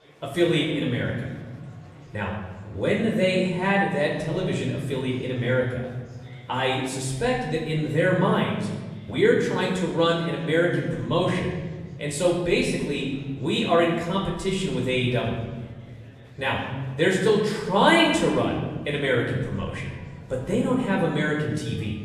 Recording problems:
off-mic speech; far
room echo; noticeable; dies away in 1.6 s
murmuring crowd; faint; throughout; 25 dB below the speech

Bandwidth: 13.5 kHz